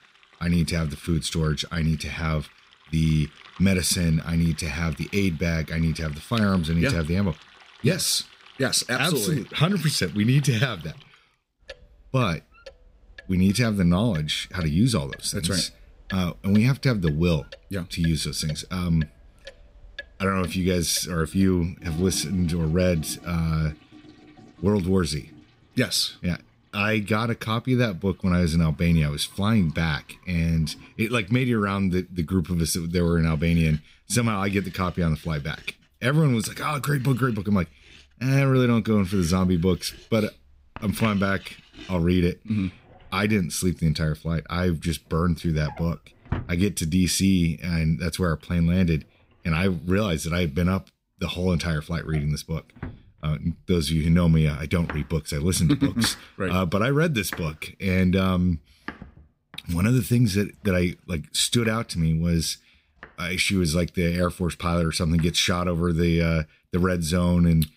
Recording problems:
household noises; faint; throughout; 20 dB below the speech

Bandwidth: 15.5 kHz